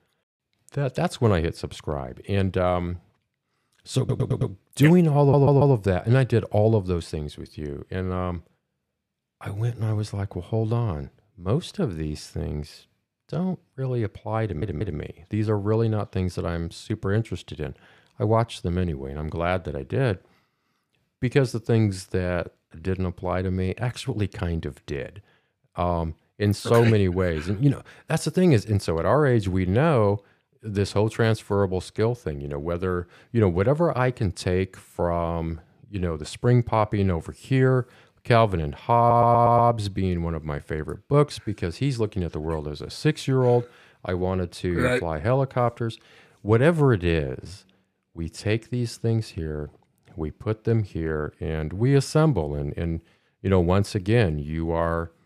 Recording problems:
audio stuttering; 4 times, first at 4 s

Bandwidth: 15 kHz